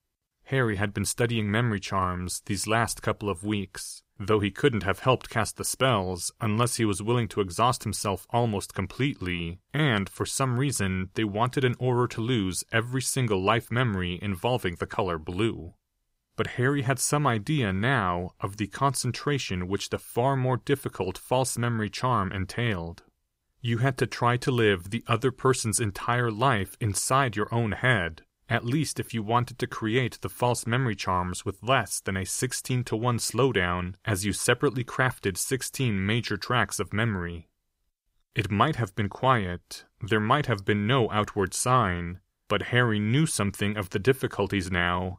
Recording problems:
none

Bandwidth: 15.5 kHz